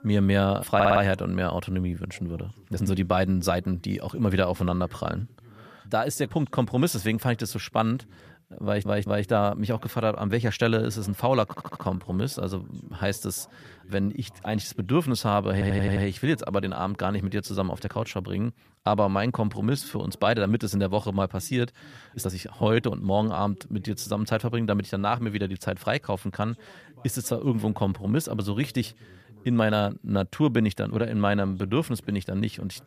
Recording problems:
voice in the background; faint; throughout; 25 dB below the speech
audio stuttering; 4 times, first at 0.5 s
uneven, jittery; strongly; from 2.5 to 30 s

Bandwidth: 14.5 kHz